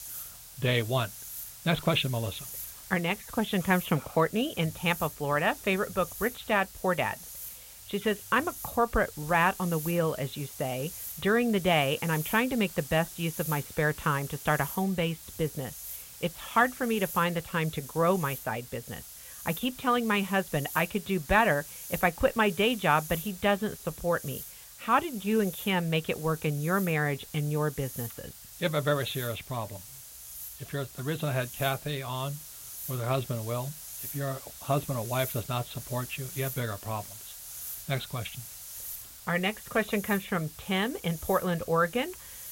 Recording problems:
high frequencies cut off; severe; nothing above 4 kHz
hiss; noticeable; throughout; 10 dB below the speech

